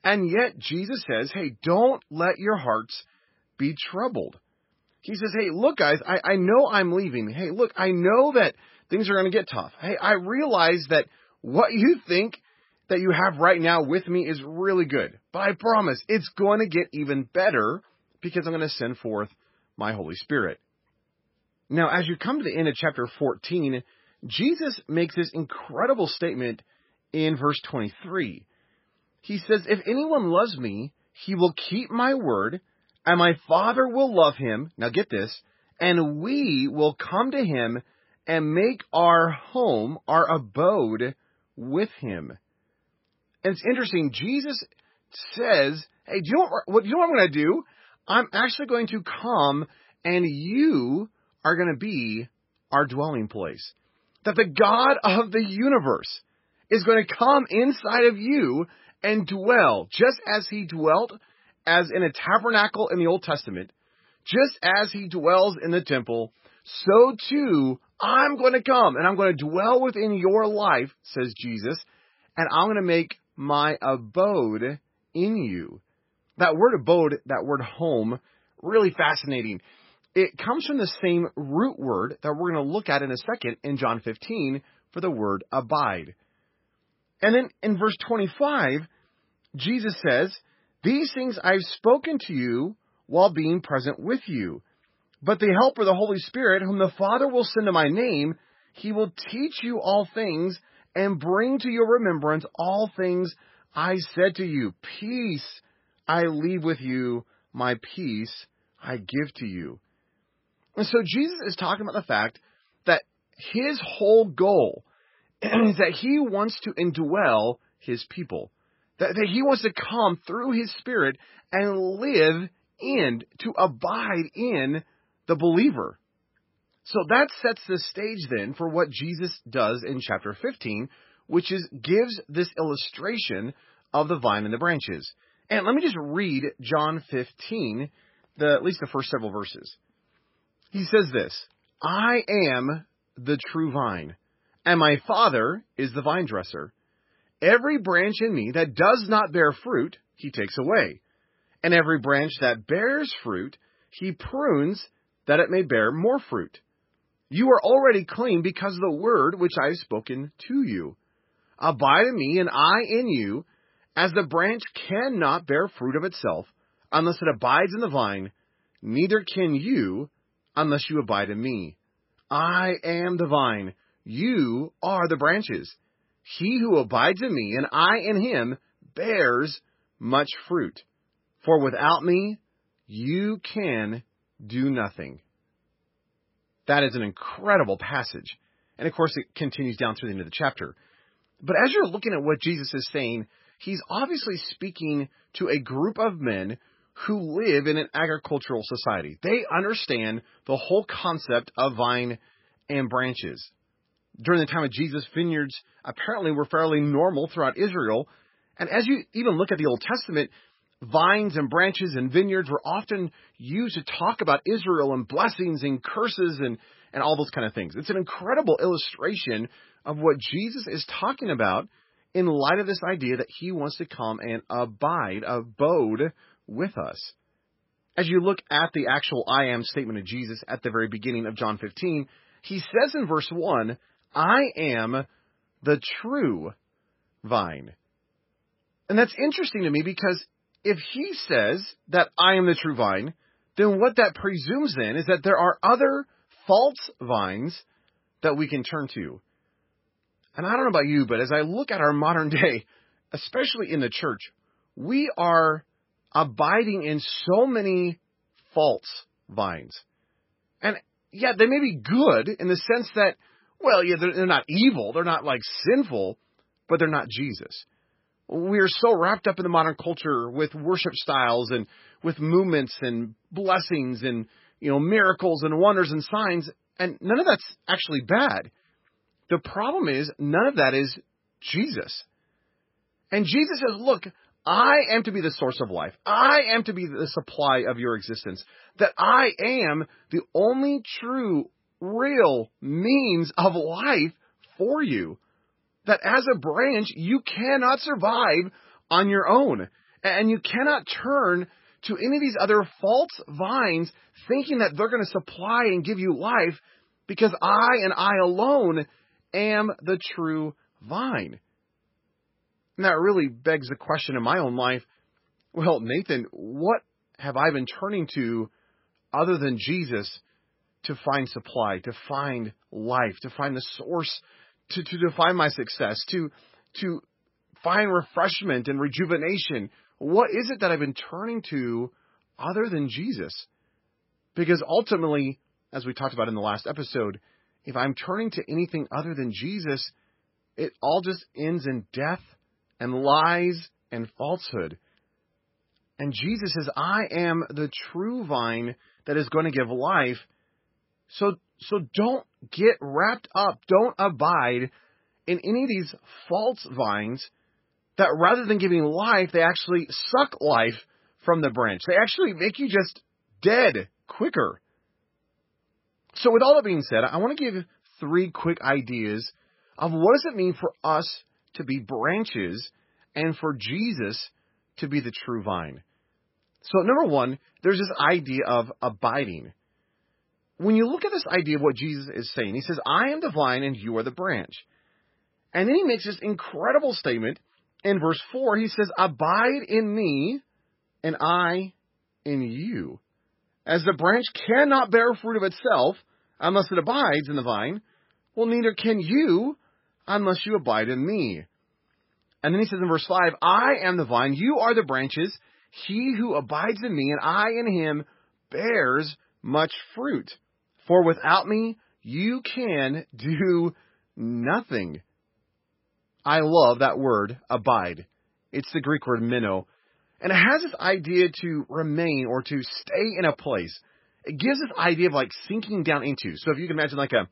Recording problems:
garbled, watery; badly; nothing above 5.5 kHz

